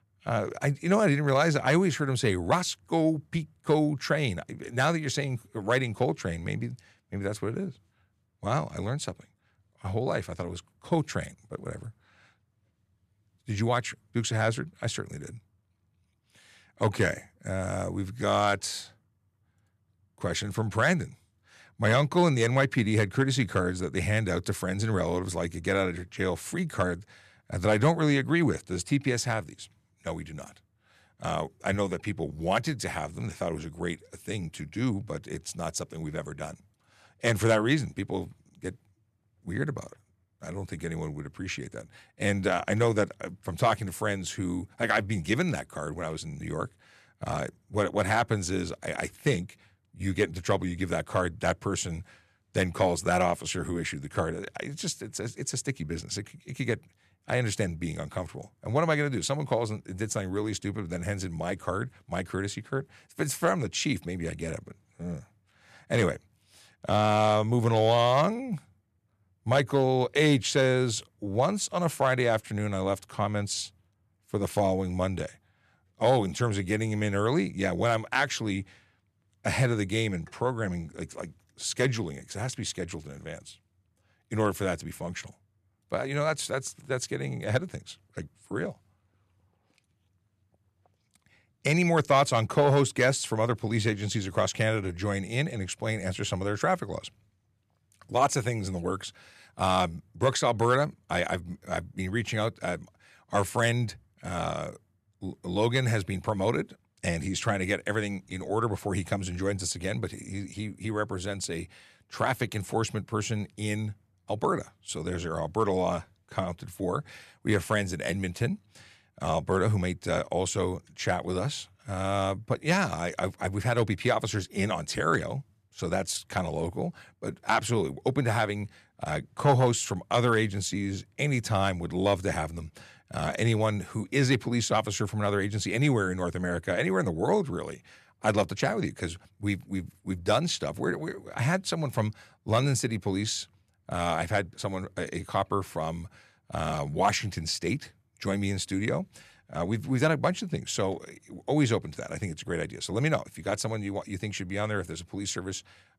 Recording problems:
none

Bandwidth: 14 kHz